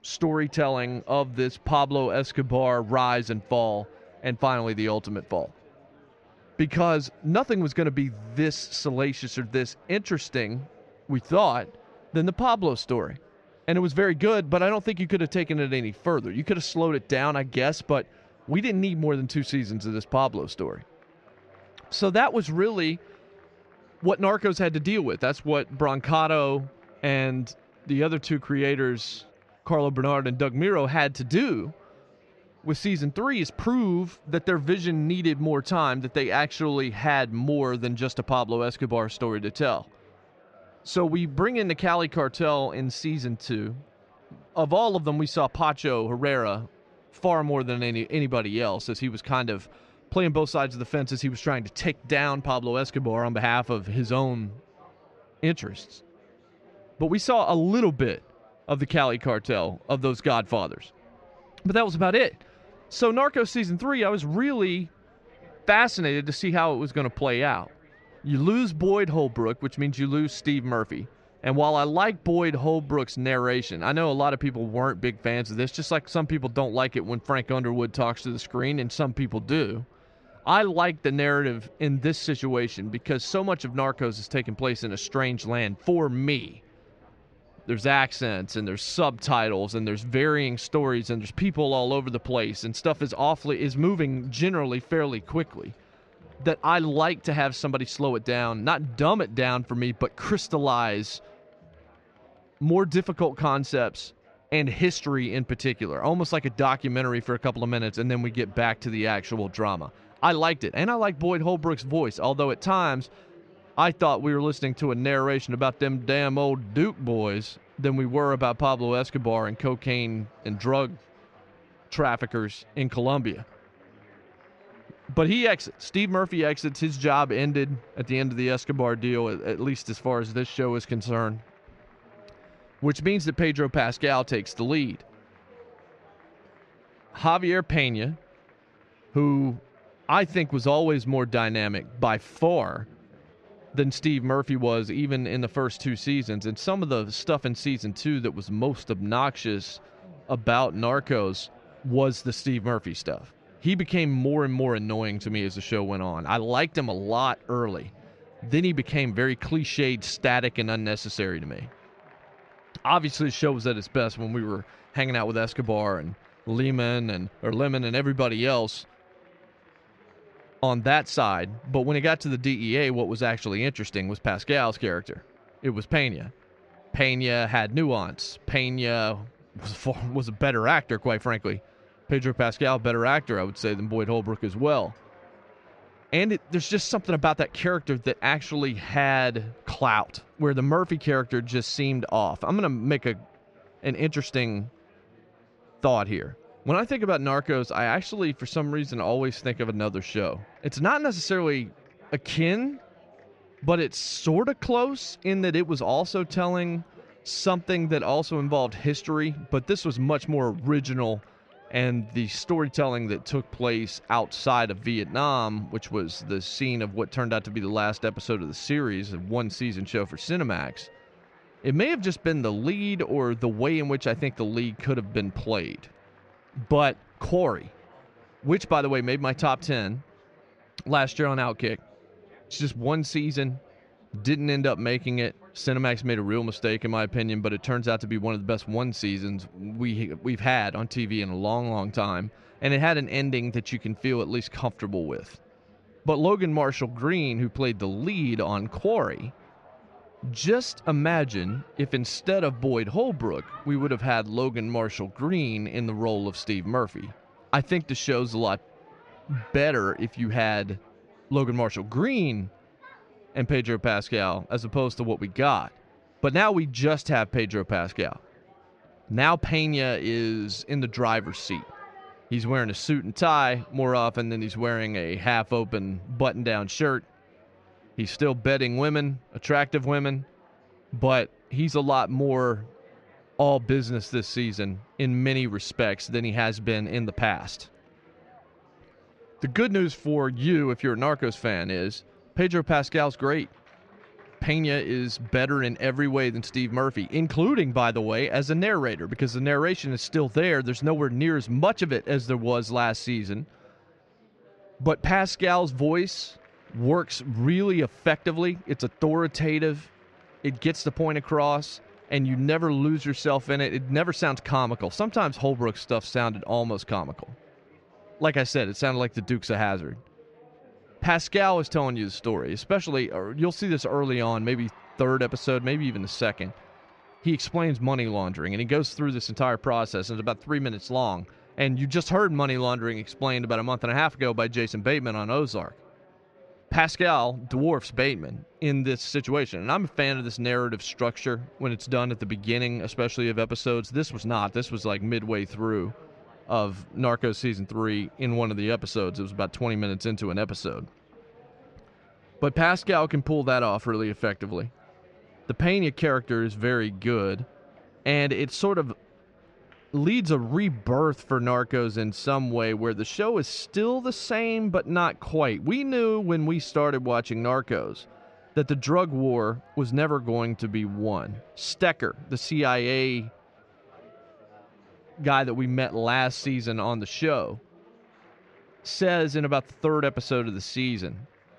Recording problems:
muffled; slightly; fading above 2.5 kHz
chatter from many people; faint; throughout; 30 dB below the speech

